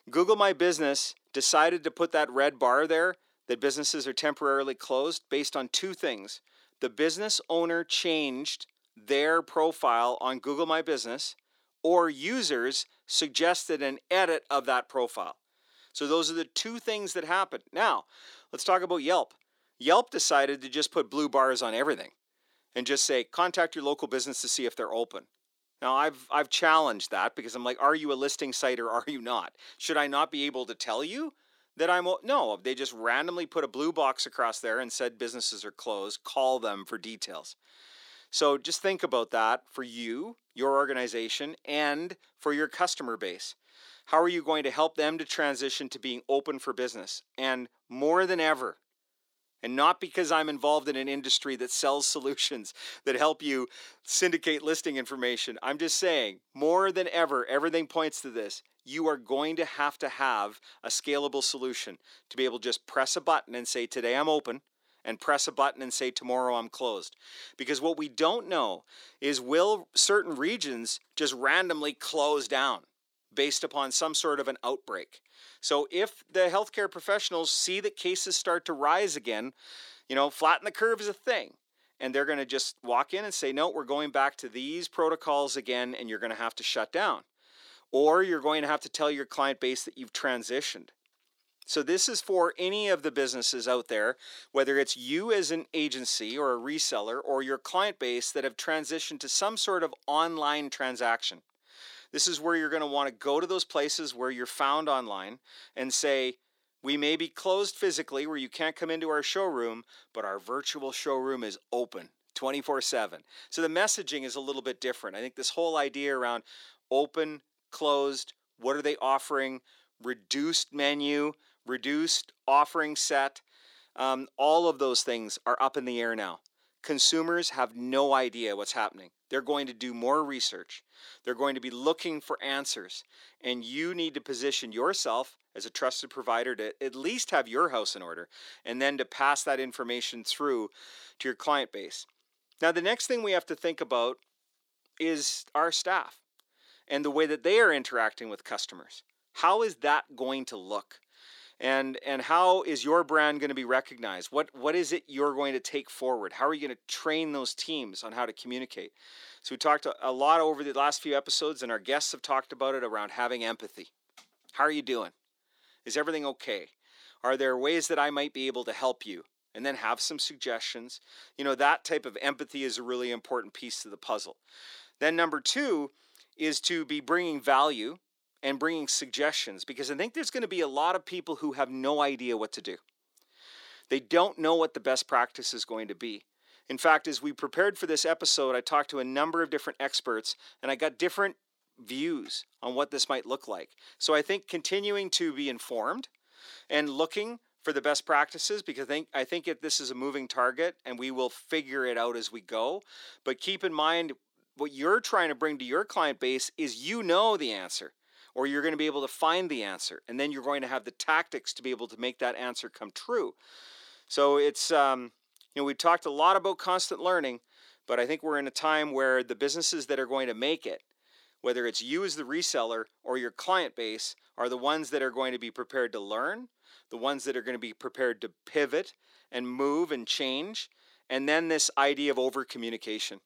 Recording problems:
thin; somewhat; fading below 300 Hz

